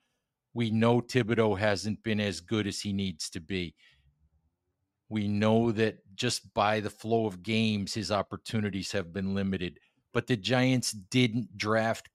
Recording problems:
none

